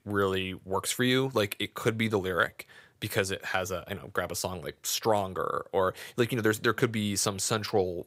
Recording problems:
none

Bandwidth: 15.5 kHz